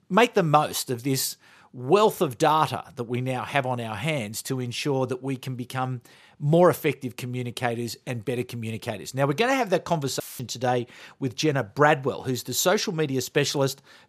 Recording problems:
audio cutting out; filled with static; at 10 s

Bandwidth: 14.5 kHz